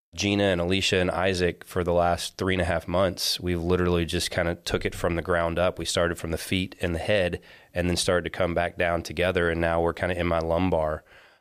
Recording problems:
none

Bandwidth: 15 kHz